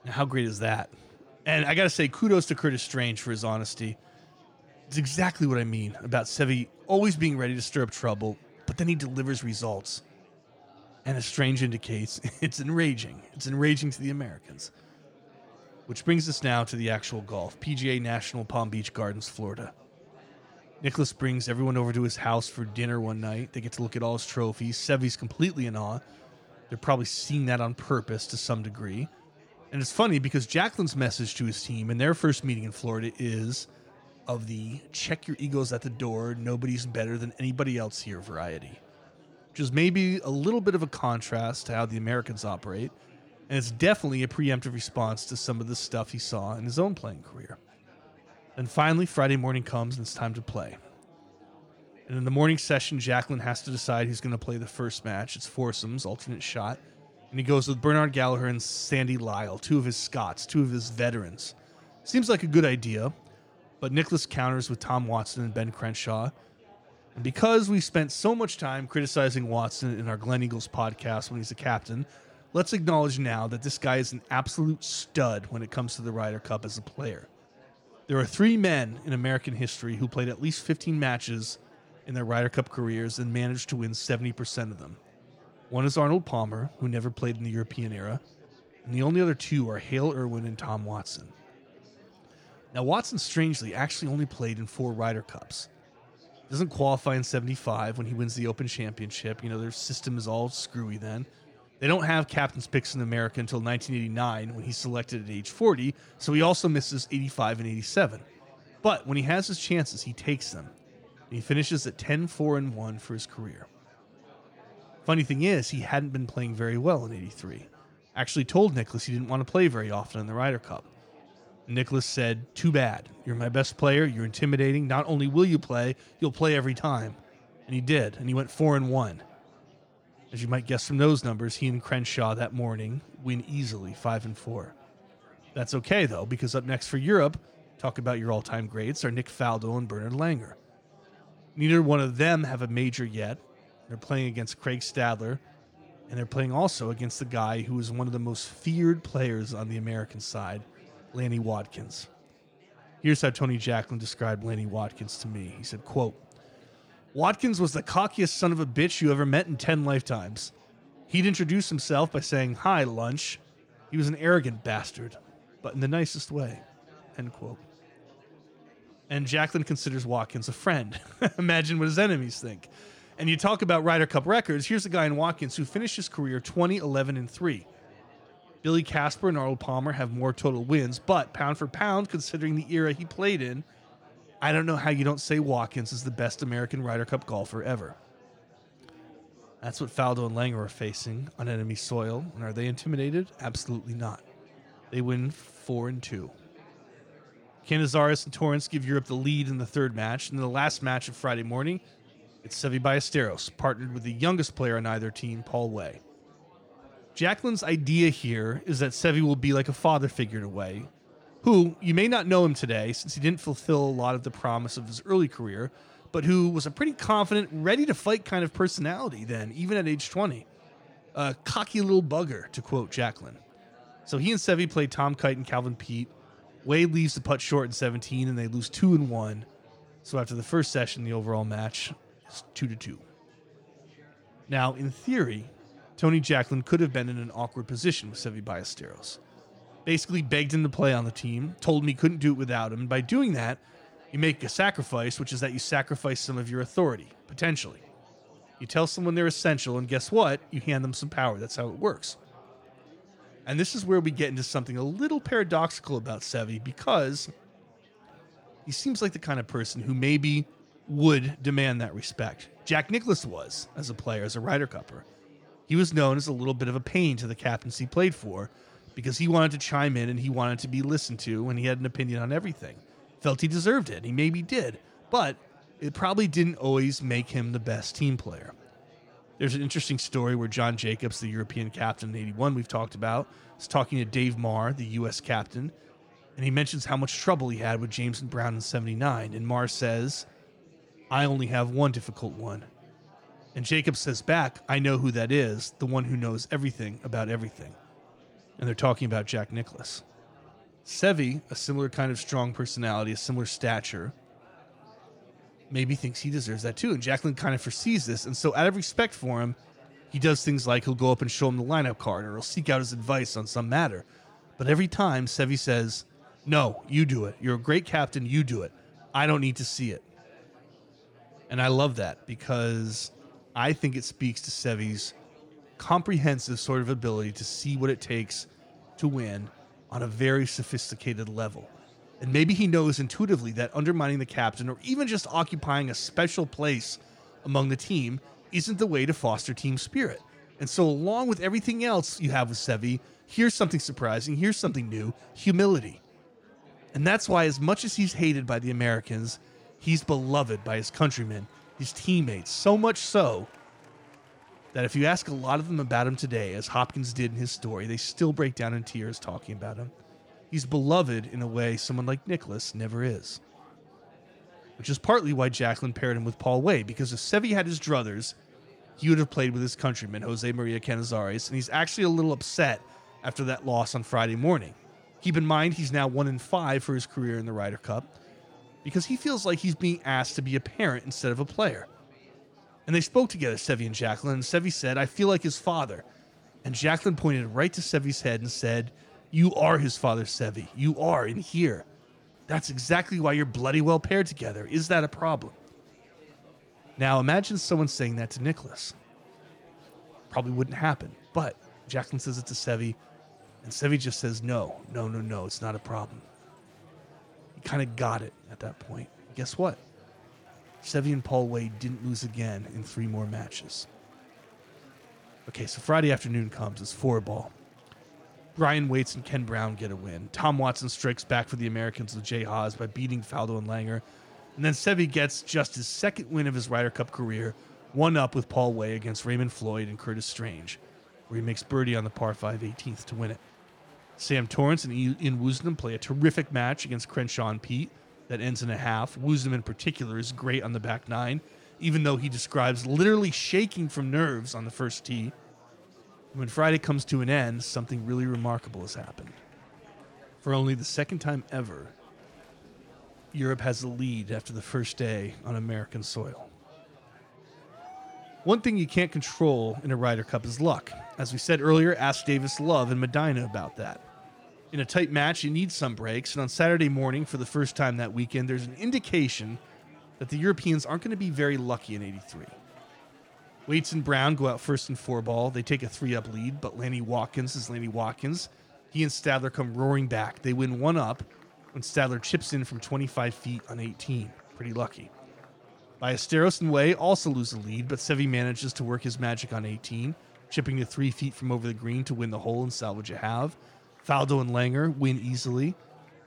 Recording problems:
murmuring crowd; faint; throughout; 25 dB below the speech

